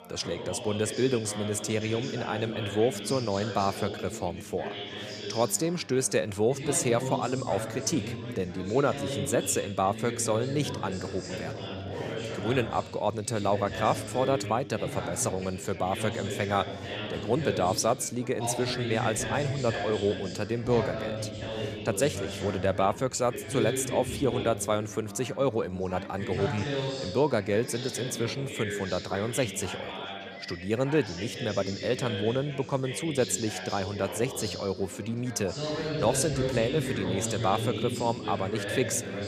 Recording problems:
background chatter; loud; throughout; 4 voices, 6 dB below the speech

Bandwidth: 15 kHz